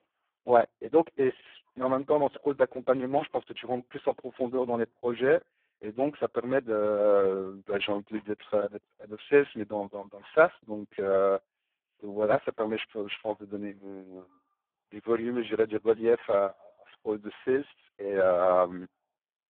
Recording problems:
phone-call audio; poor line

